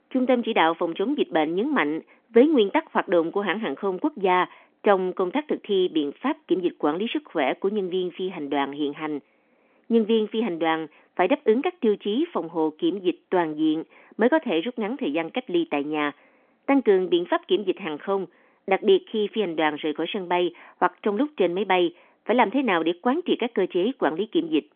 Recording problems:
phone-call audio; nothing above 3.5 kHz

